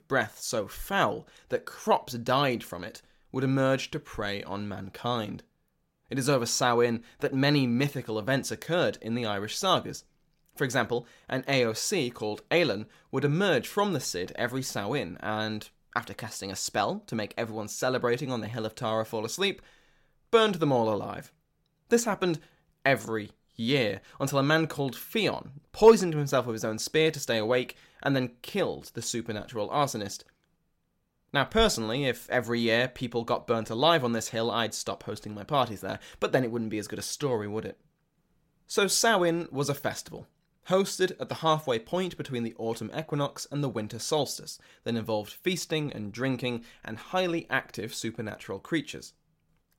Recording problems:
none

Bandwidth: 16.5 kHz